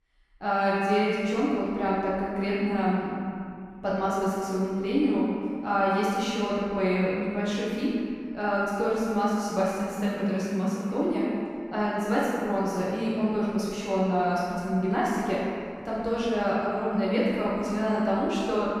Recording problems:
room echo; strong; dies away in 2.1 s
off-mic speech; far

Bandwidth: 14.5 kHz